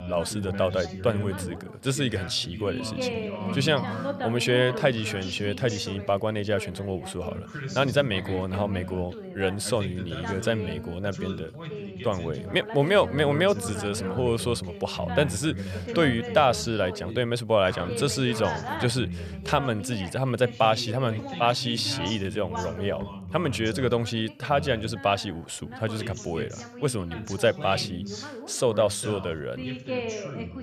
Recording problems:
background chatter; loud; throughout; 2 voices, 9 dB below the speech

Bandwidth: 14.5 kHz